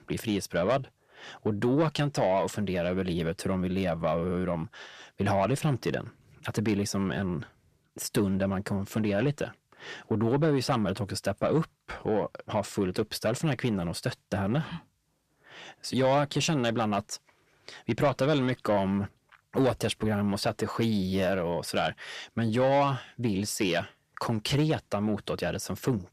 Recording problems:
distortion; slight; 10 dB below the speech

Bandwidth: 14.5 kHz